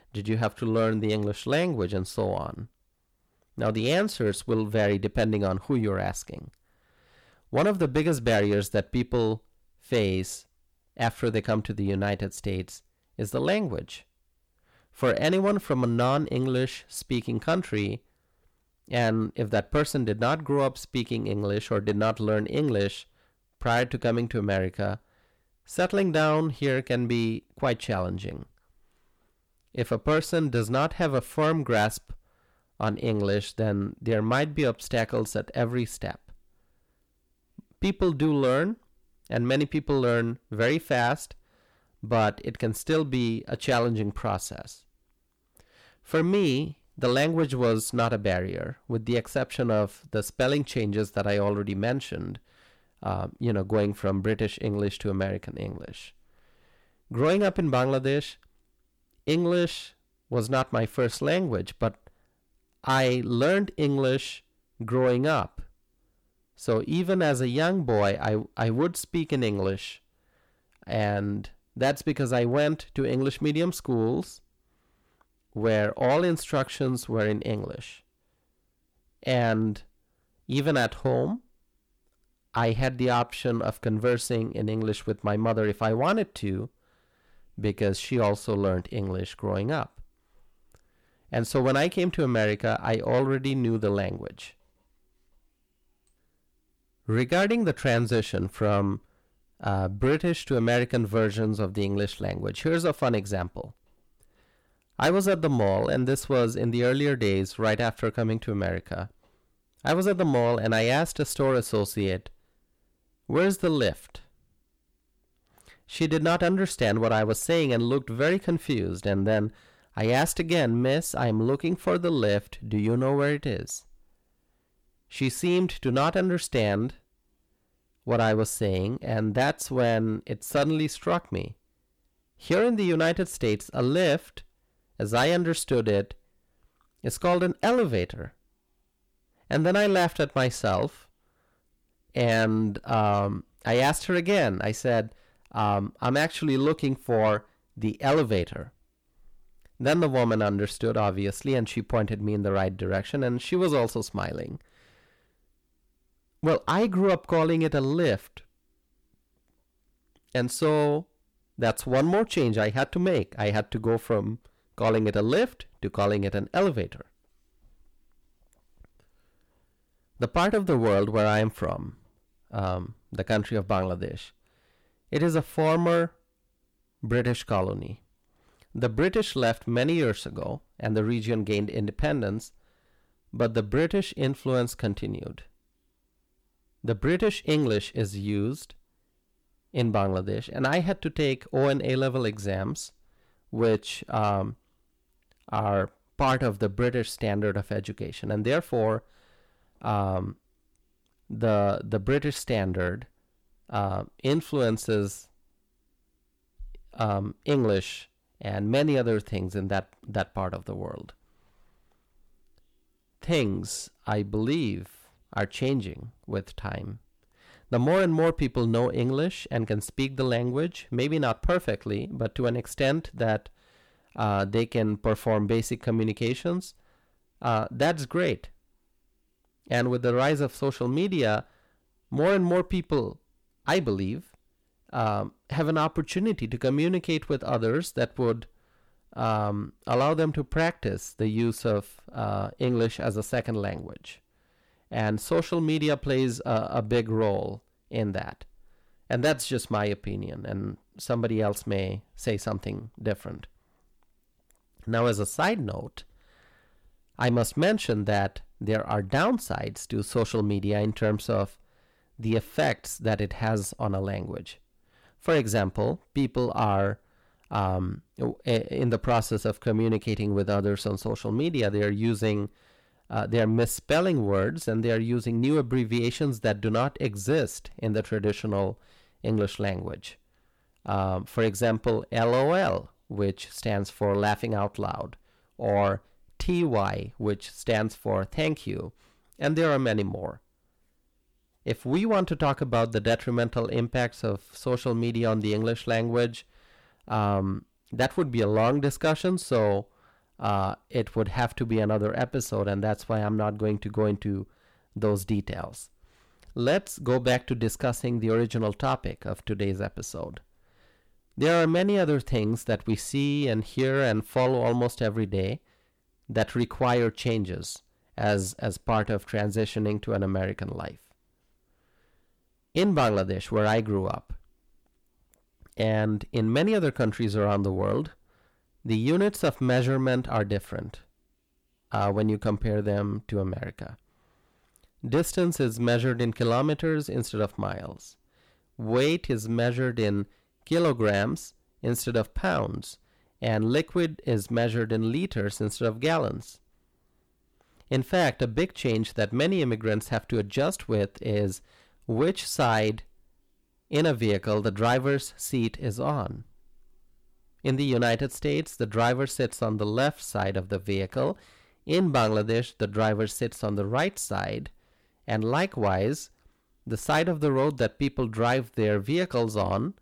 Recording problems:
distortion; slight; 10 dB below the speech

